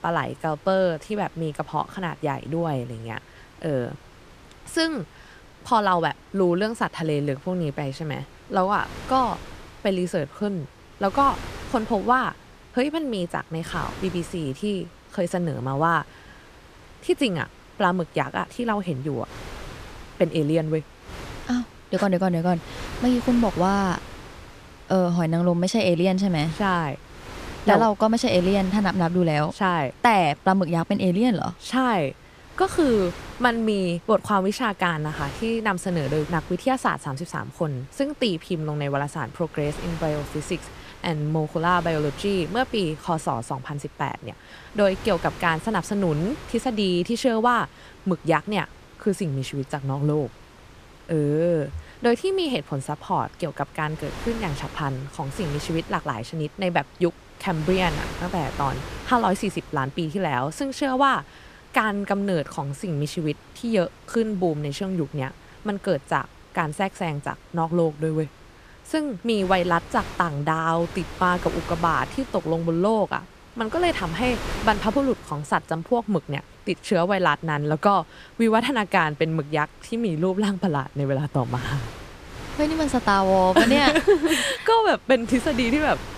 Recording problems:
wind noise on the microphone; occasional gusts; 15 dB below the speech

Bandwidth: 14.5 kHz